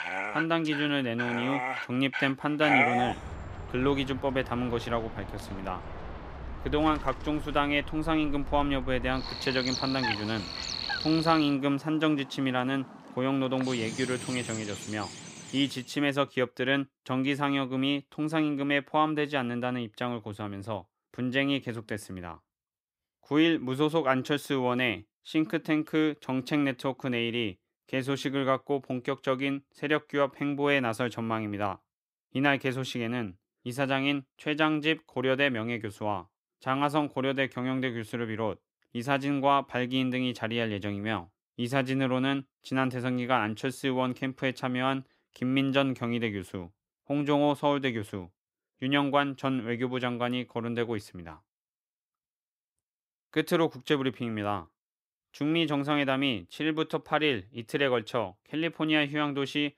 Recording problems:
animal sounds; loud; until 16 s; 5 dB below the speech

